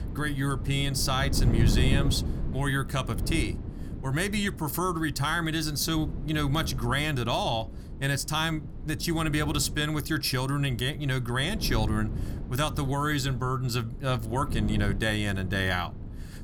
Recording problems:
wind noise on the microphone; occasional gusts; 15 dB below the speech

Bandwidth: 18.5 kHz